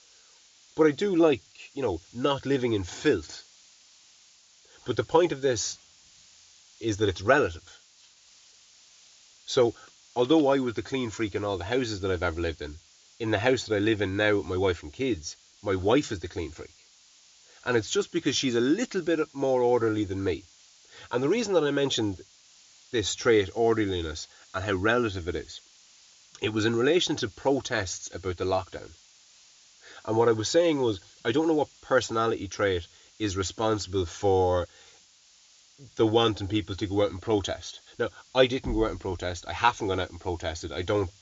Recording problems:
high frequencies cut off; noticeable; nothing above 7 kHz
hiss; faint; throughout; 25 dB below the speech

